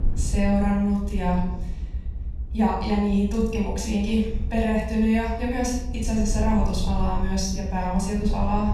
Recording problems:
off-mic speech; far
room echo; noticeable; dies away in 0.8 s
low rumble; noticeable; throughout; 20 dB below the speech

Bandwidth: 13.5 kHz